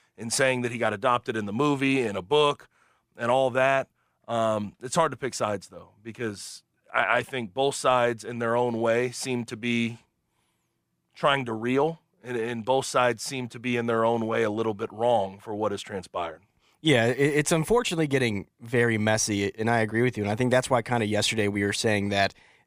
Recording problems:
none

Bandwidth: 15 kHz